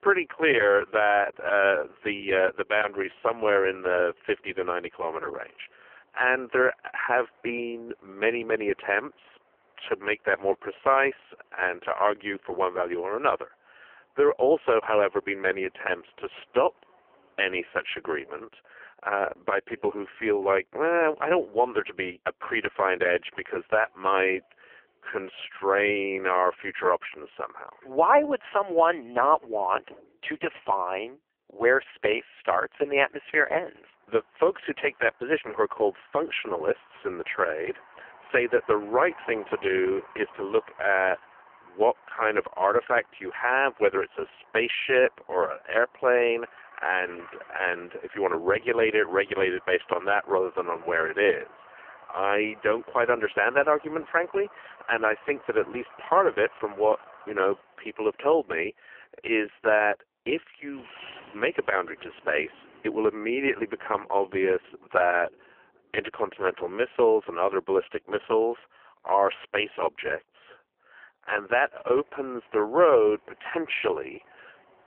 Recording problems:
phone-call audio; poor line; nothing above 3 kHz
traffic noise; faint; throughout; 25 dB below the speech

